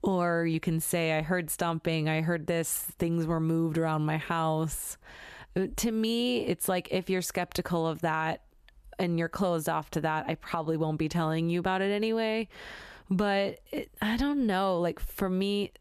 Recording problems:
squashed, flat; somewhat

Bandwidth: 14.5 kHz